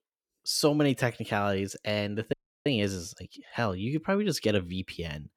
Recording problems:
audio cutting out; at 2.5 s

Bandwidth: 18 kHz